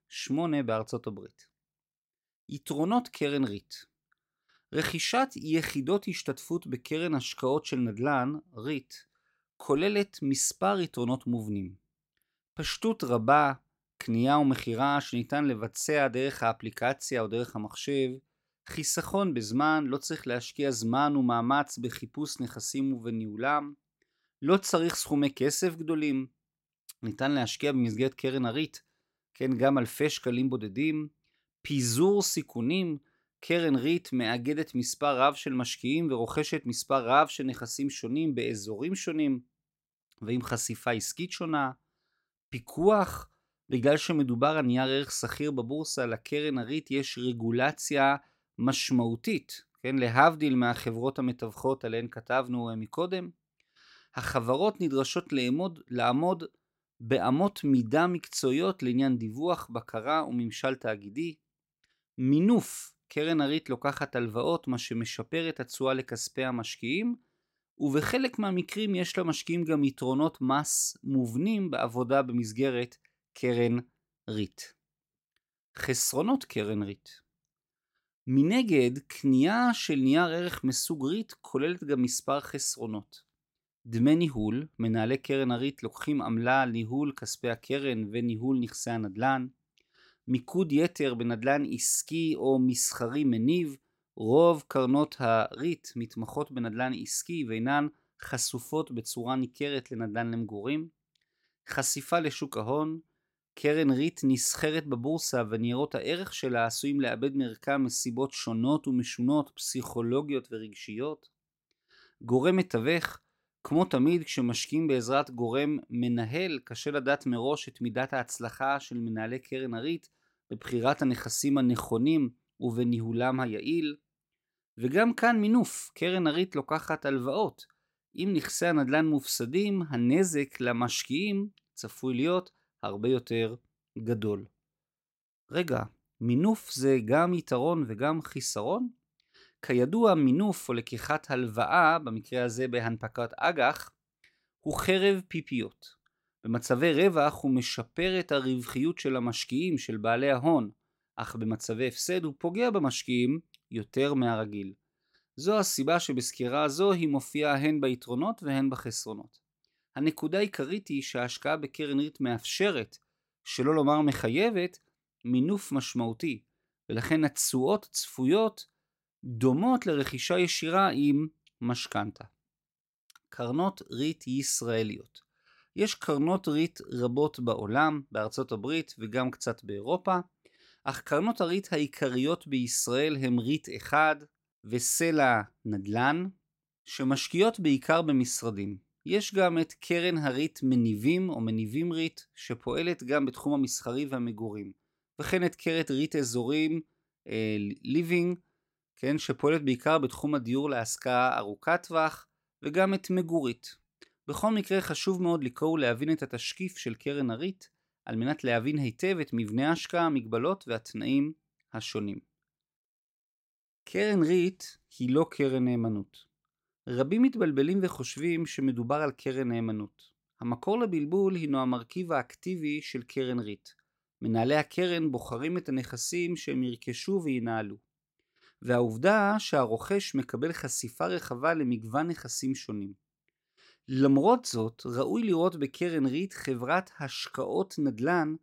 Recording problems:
none

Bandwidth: 16 kHz